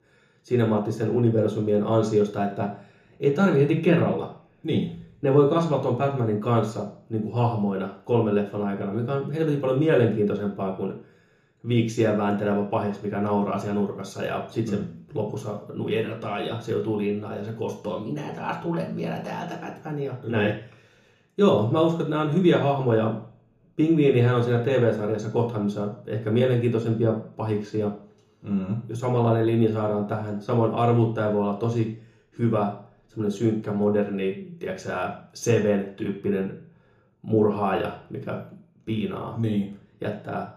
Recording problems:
off-mic speech; far
room echo; slight; dies away in 0.7 s

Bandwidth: 14.5 kHz